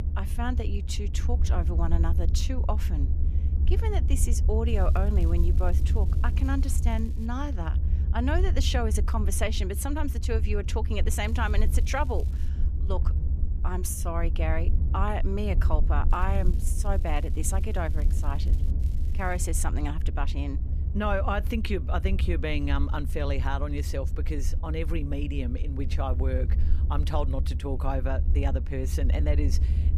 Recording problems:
low rumble; noticeable; throughout; 10 dB below the speech
crackling; faint; 4 times, first at 4.5 s; 25 dB below the speech

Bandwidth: 14.5 kHz